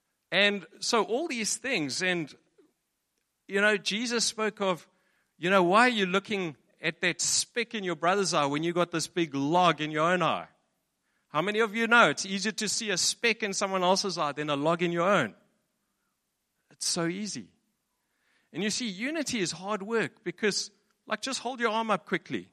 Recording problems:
none

